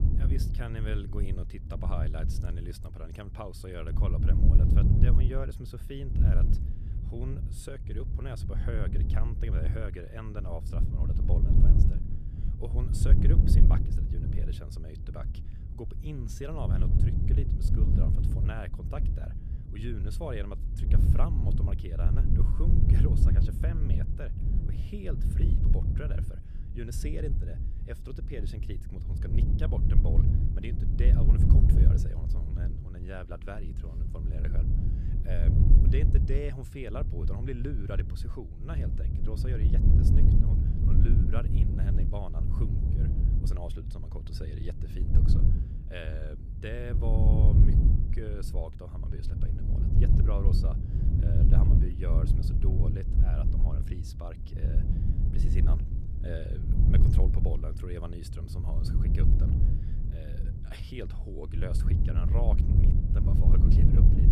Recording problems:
wind noise on the microphone; heavy; 1 dB above the speech

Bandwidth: 14 kHz